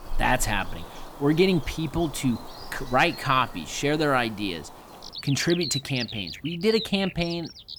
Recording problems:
animal sounds; noticeable; throughout; 10 dB below the speech

